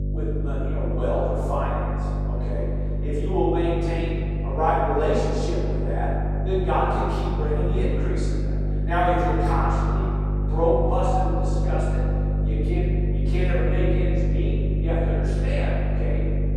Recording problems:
room echo; strong; dies away in 2.9 s
off-mic speech; far
electrical hum; noticeable; throughout; 50 Hz, 10 dB below the speech

